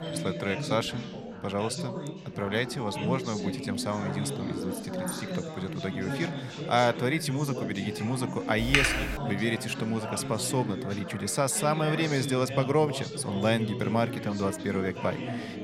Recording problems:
background chatter; loud; throughout; 4 voices, 6 dB below the speech
doorbell; faint; until 2 s; peak 10 dB below the speech
keyboard typing; loud; at 8.5 s; peak 6 dB above the speech

